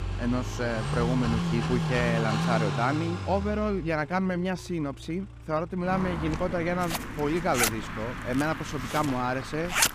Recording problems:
household noises; loud; throughout; 4 dB below the speech
traffic noise; loud; throughout; 3 dB below the speech

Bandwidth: 15 kHz